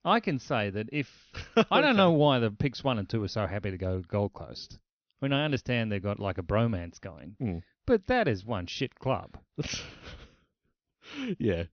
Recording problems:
high frequencies cut off; noticeable; nothing above 6 kHz

